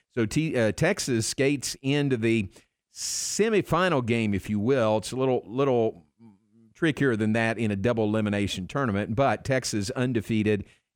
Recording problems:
none

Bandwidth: 18.5 kHz